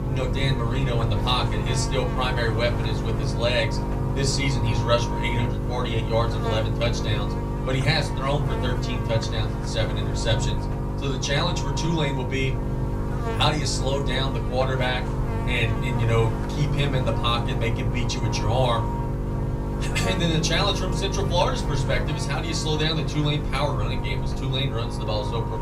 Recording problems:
off-mic speech; far
room echo; very slight; dies away in 0.3 s
electrical hum; loud; throughout; 50 Hz, 6 dB below the speech
low rumble; noticeable; throughout; 20 dB below the speech

